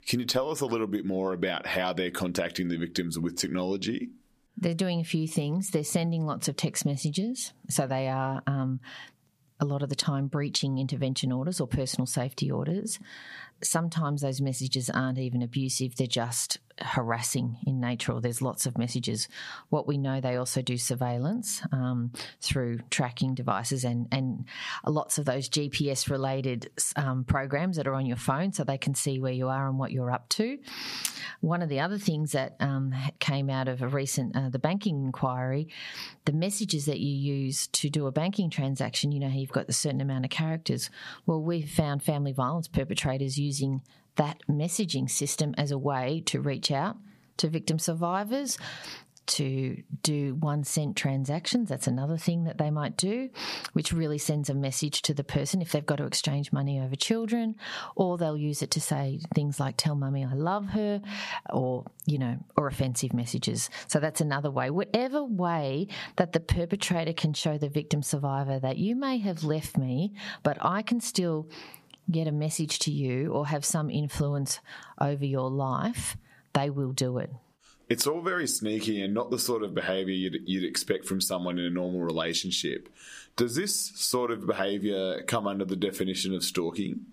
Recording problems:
squashed, flat; somewhat

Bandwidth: 15 kHz